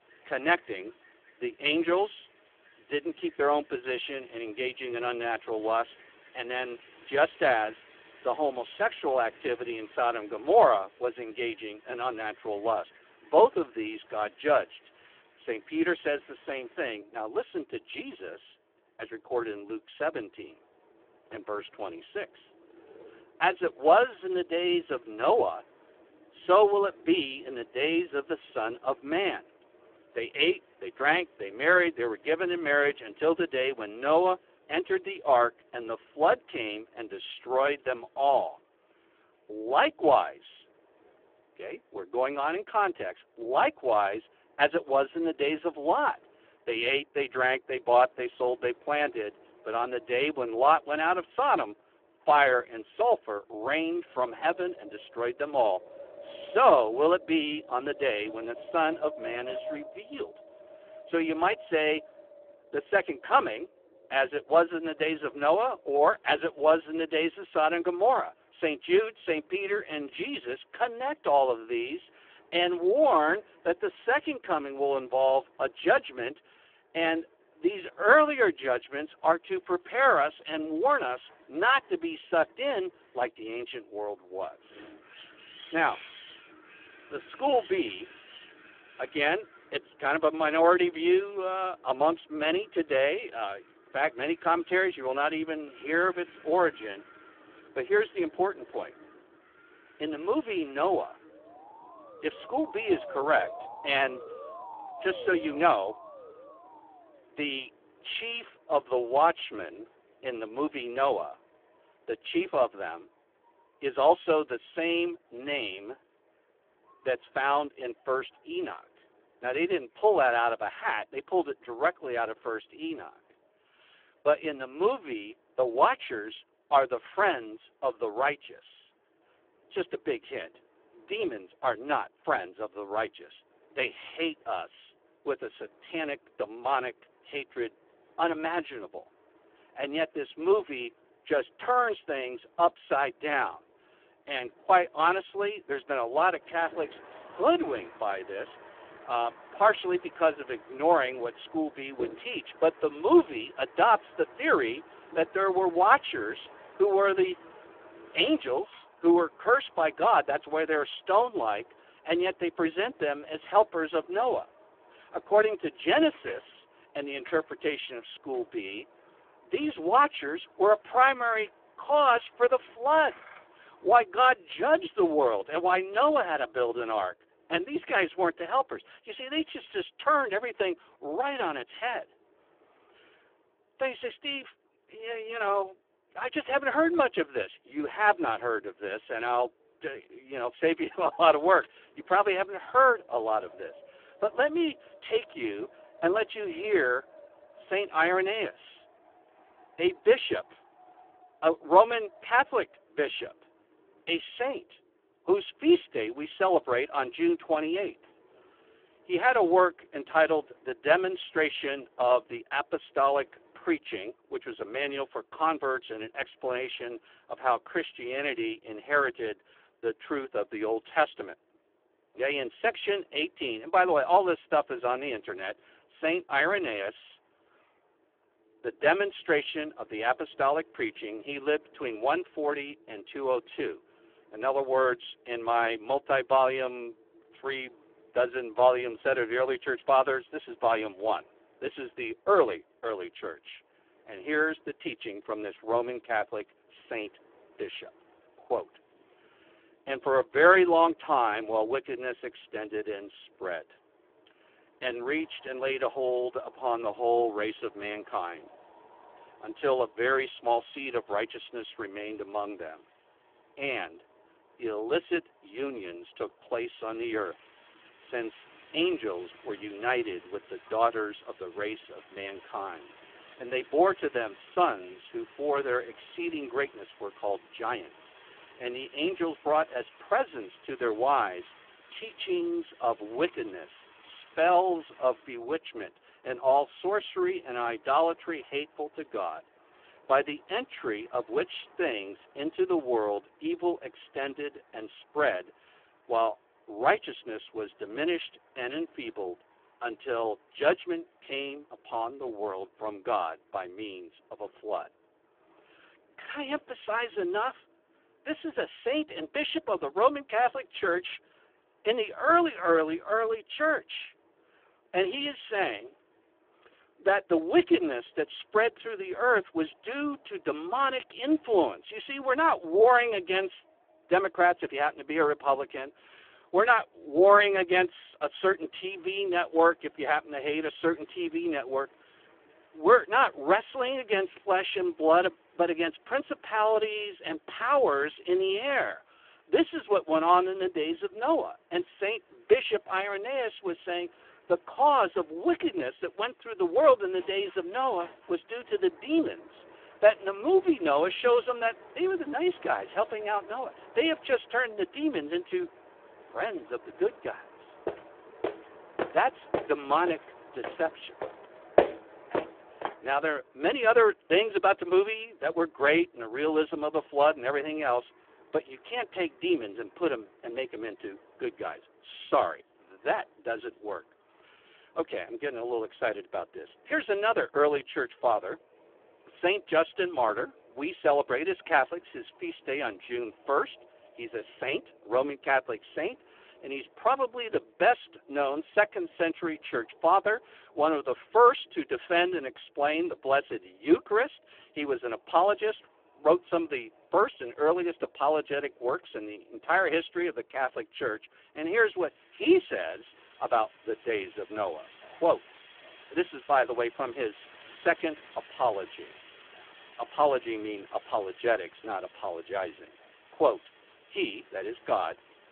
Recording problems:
phone-call audio; poor line
wind in the background; faint; throughout; 25 dB below the speech
siren; faint; from 1:42 to 1:47; peak 10 dB below the speech
footsteps; loud; from 5:58 to 6:03; peak 1 dB above the speech

